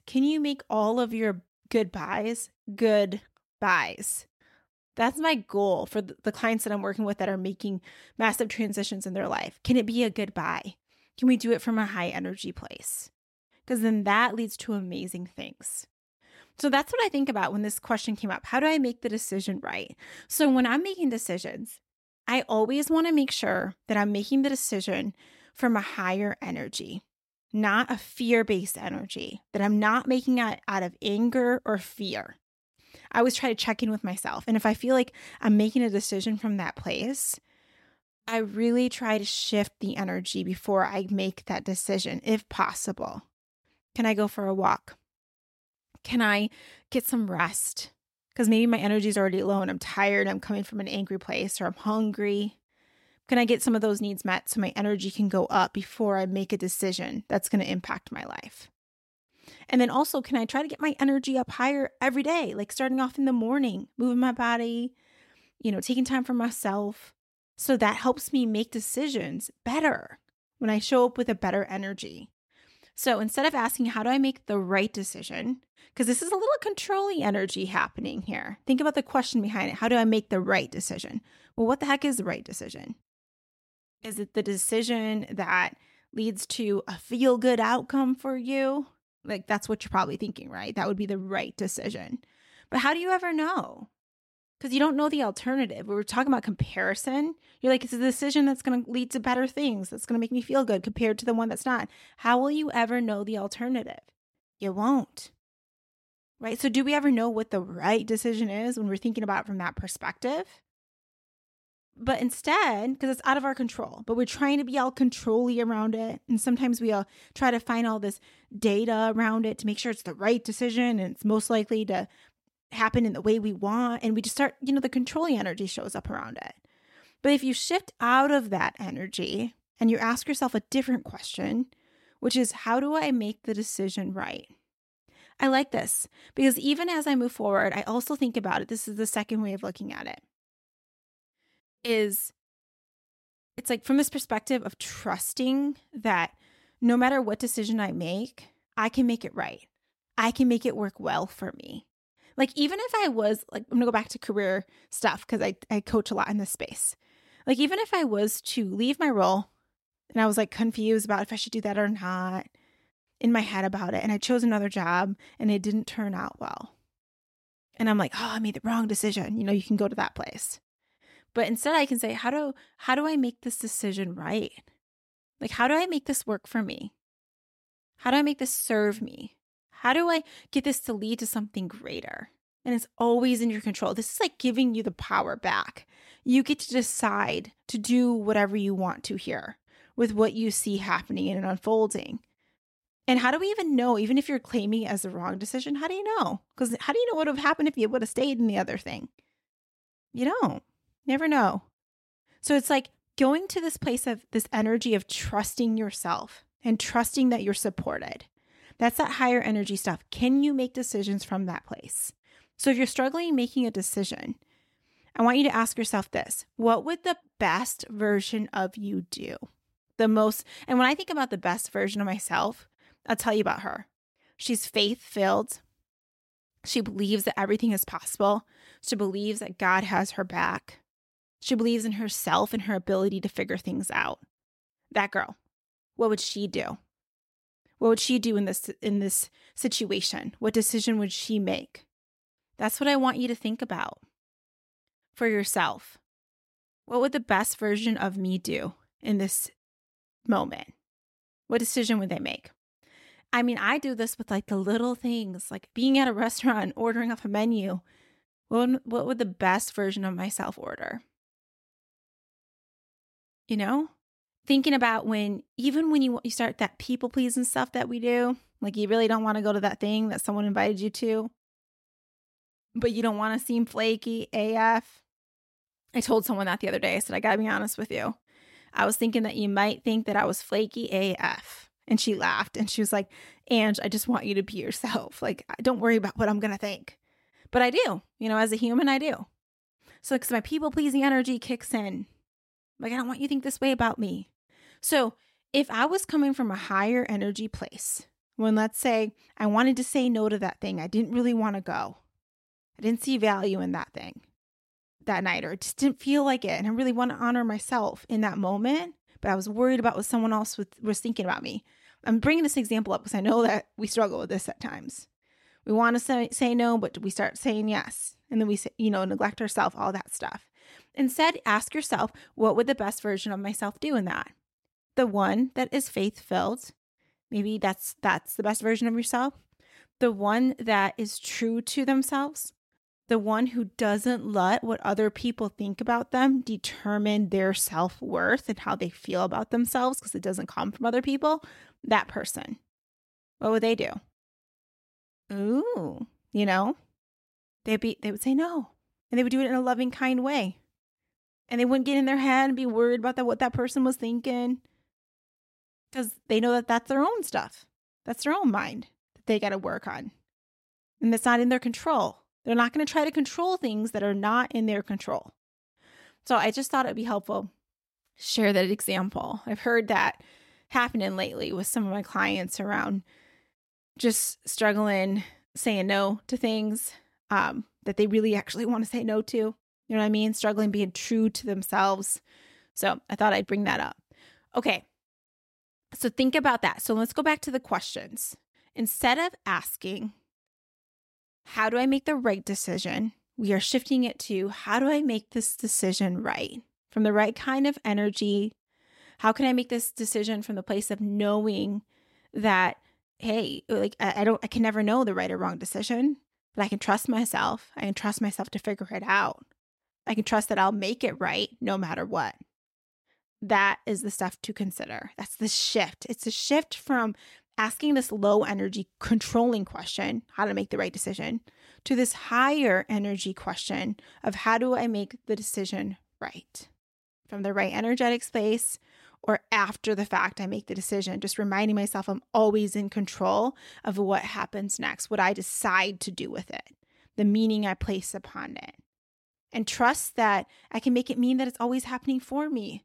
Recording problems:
none

